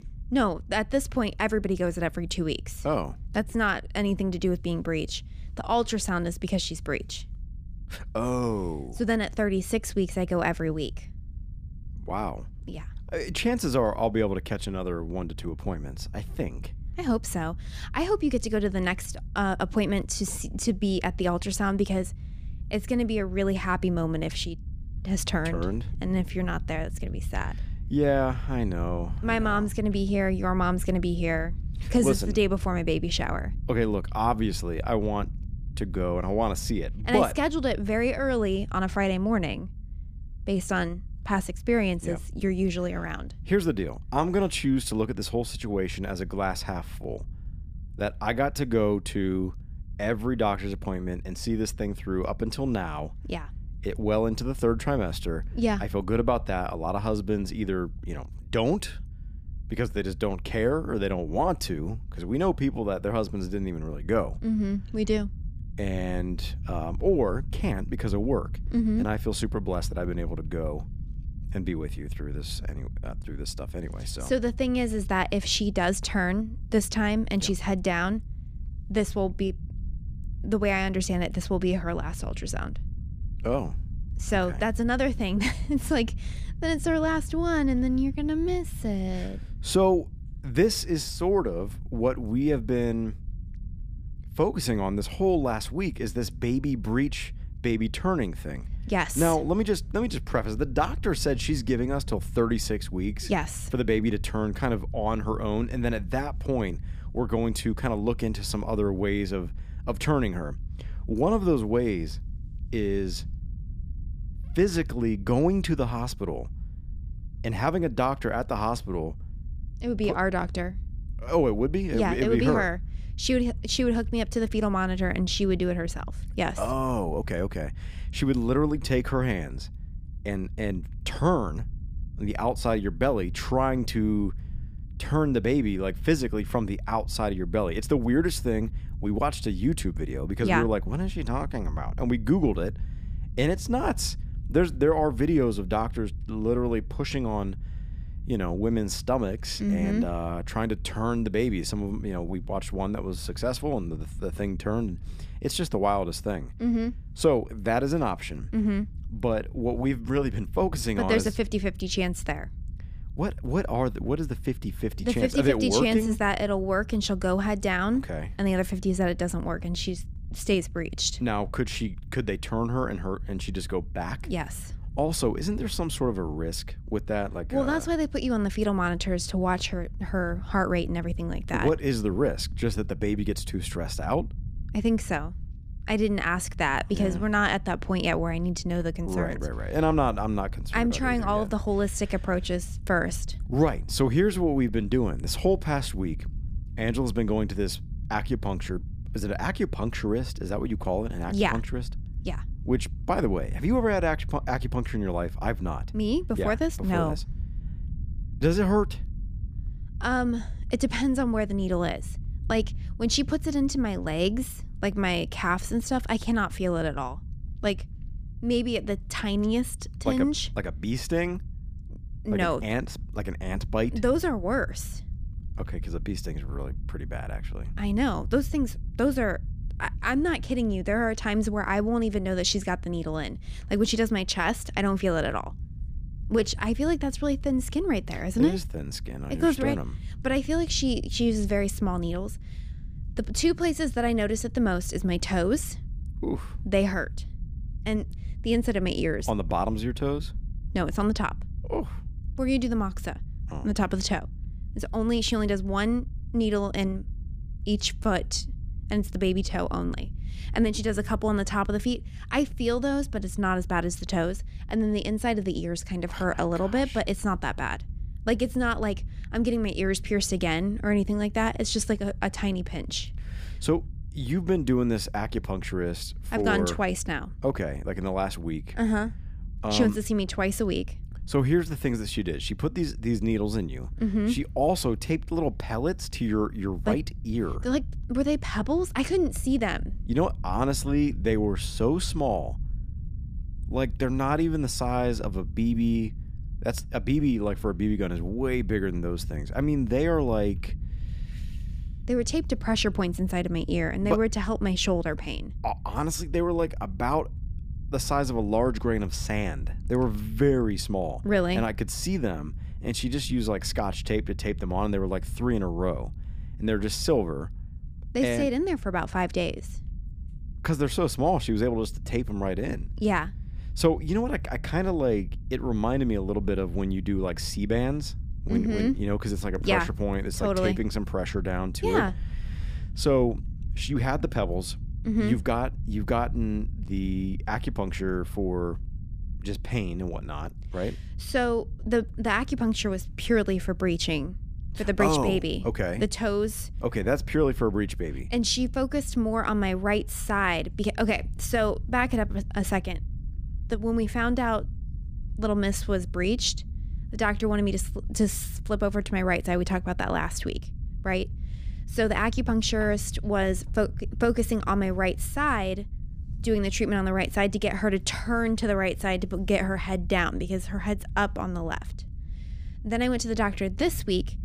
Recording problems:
low rumble; faint; throughout; 25 dB below the speech

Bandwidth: 15 kHz